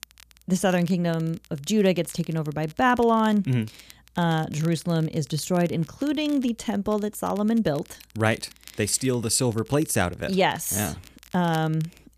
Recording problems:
crackle, like an old record; faint; 25 dB below the speech

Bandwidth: 14.5 kHz